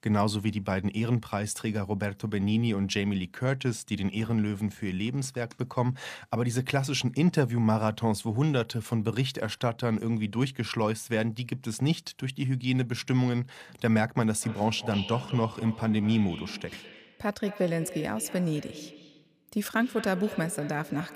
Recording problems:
echo of what is said; noticeable; from 14 s on; 200 ms later, 15 dB below the speech

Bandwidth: 15 kHz